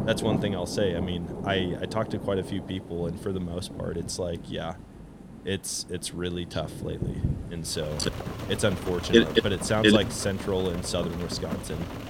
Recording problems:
rain or running water; loud; throughout; 8 dB below the speech

